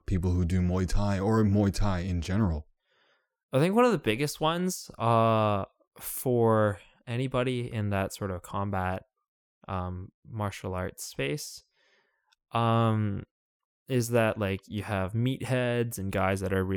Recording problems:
abrupt cut into speech; at the end

